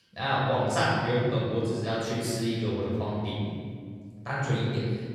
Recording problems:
room echo; strong; dies away in 2 s
off-mic speech; far

